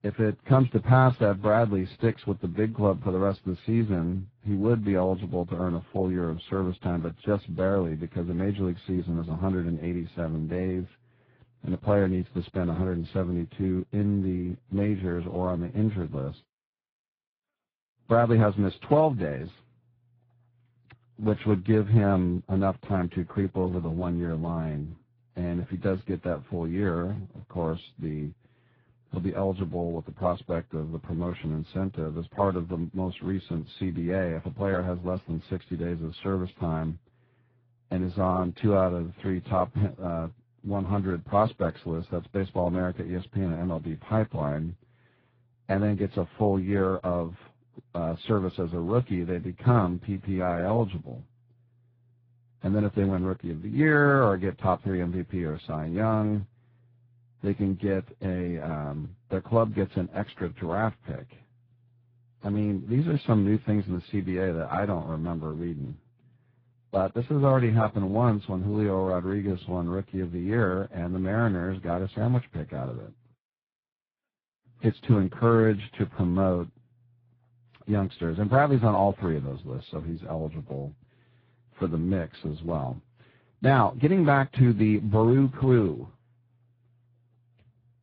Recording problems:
garbled, watery; badly
muffled; very; fading above 2 kHz

